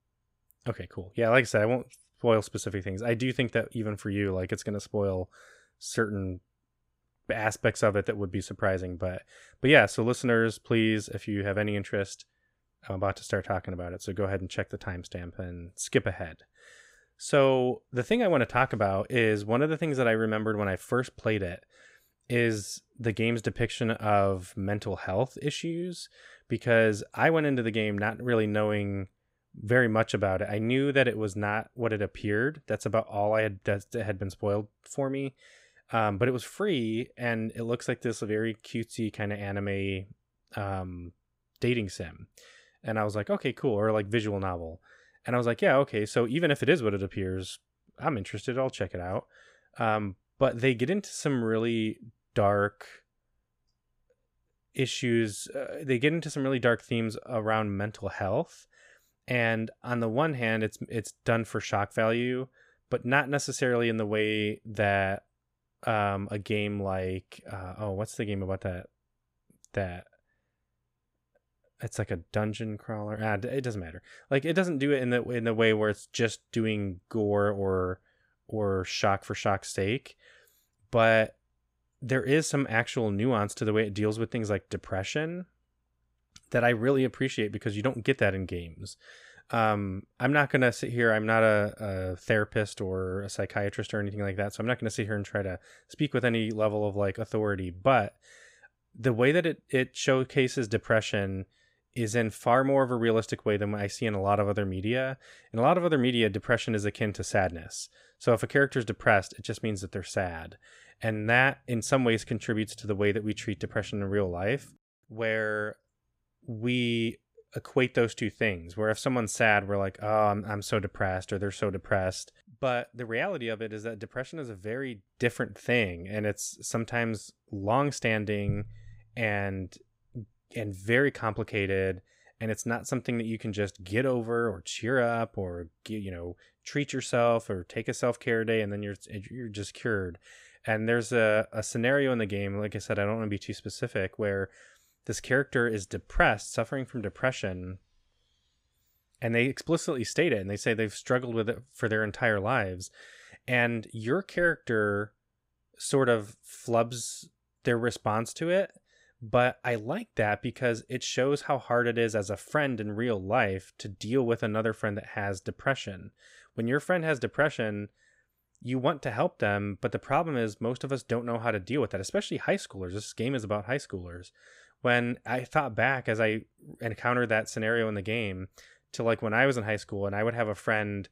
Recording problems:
none

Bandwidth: 15.5 kHz